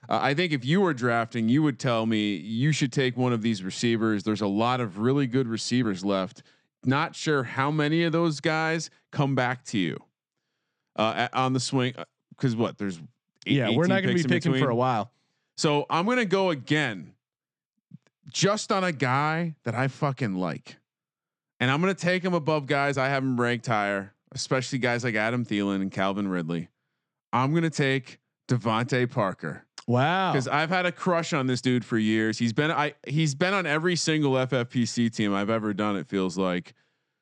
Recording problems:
uneven, jittery; slightly; from 6 to 33 s

